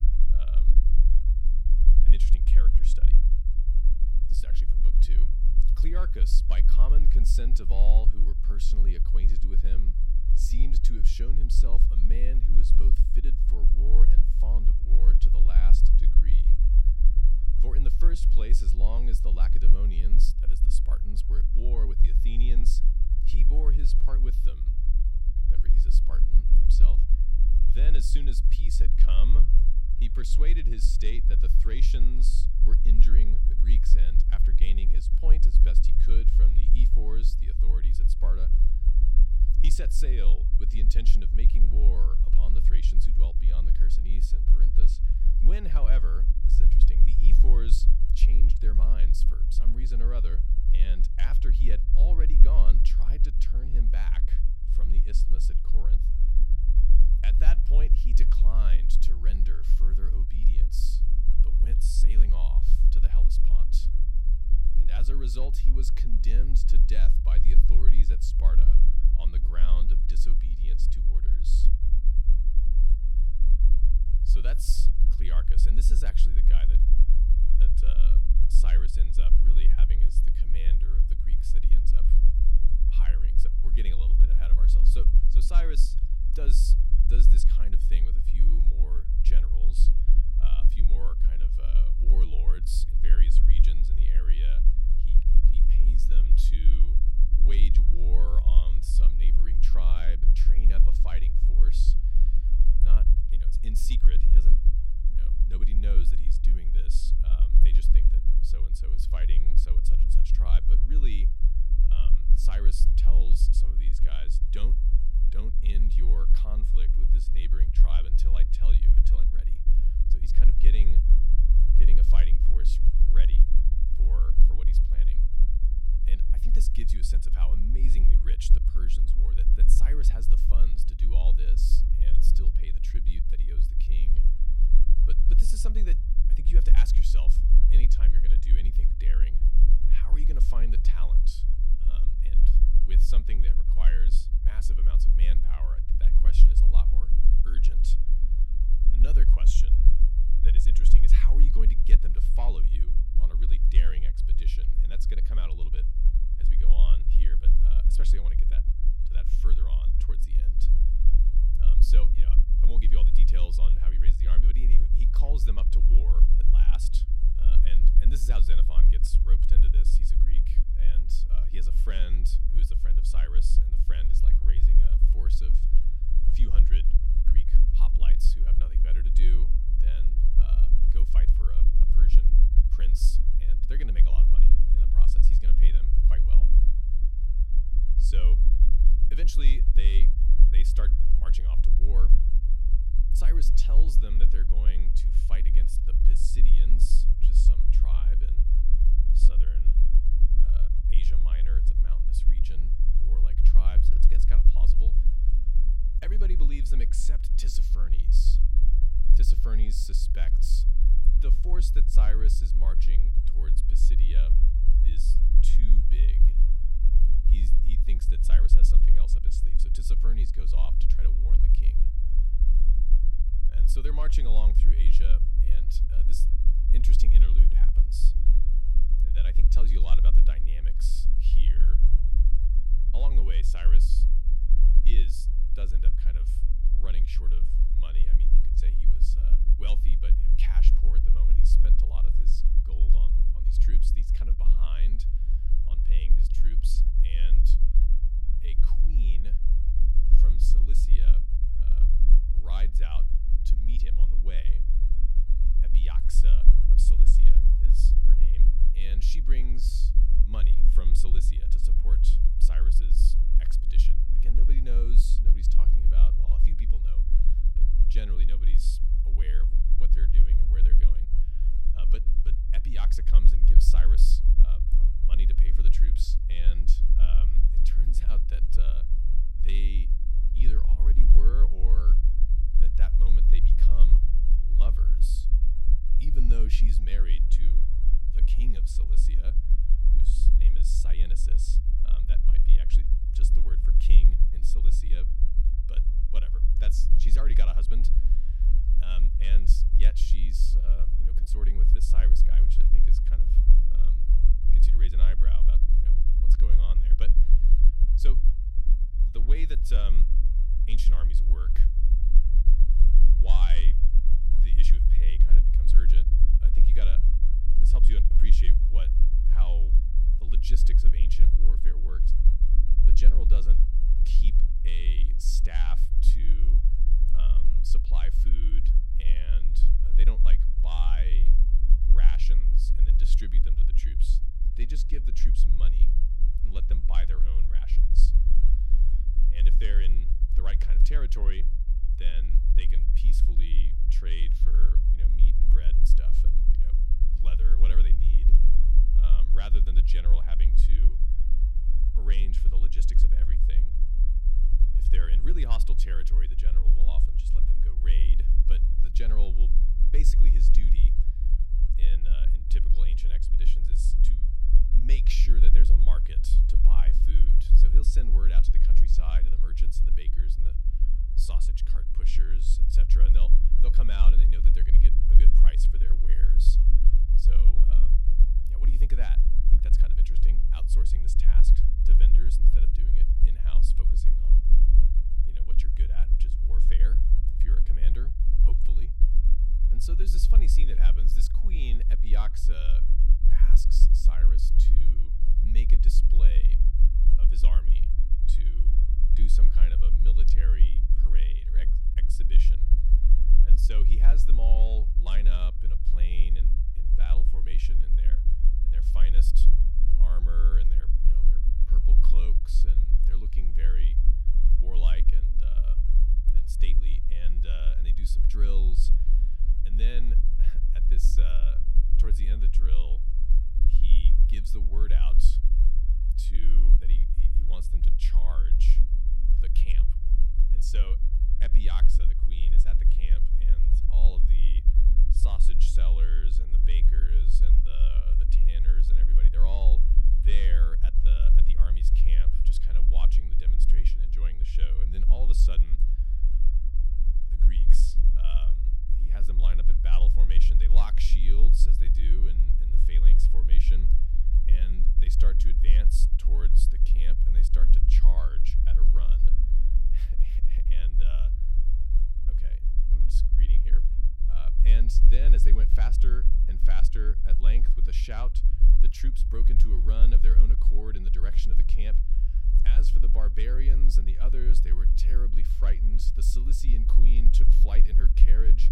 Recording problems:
low rumble; loud; throughout; 5 dB below the speech

